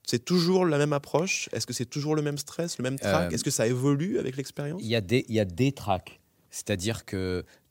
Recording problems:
none

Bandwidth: 16 kHz